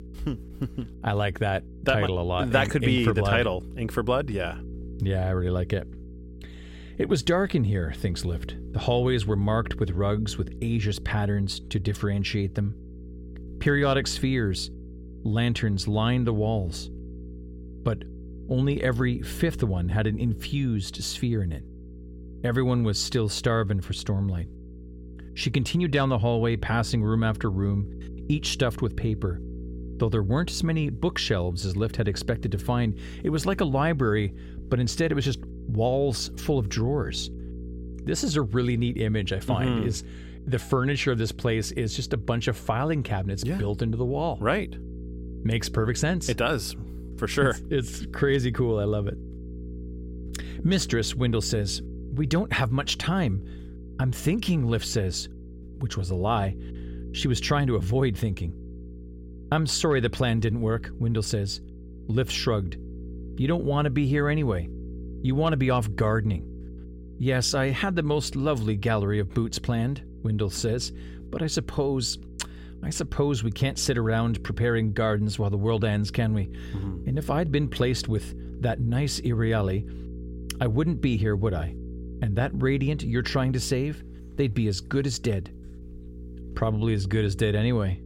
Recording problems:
electrical hum; noticeable; throughout; 60 Hz, 20 dB below the speech

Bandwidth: 16.5 kHz